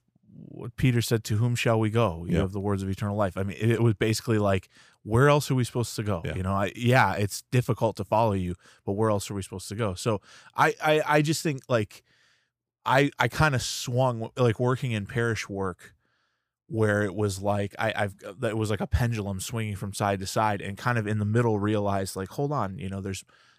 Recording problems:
none

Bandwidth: 15 kHz